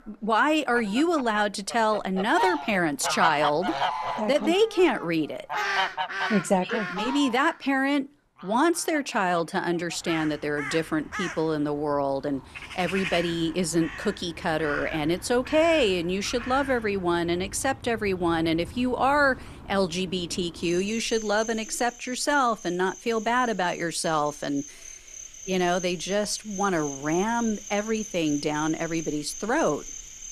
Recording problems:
animal sounds; loud; throughout; 10 dB below the speech

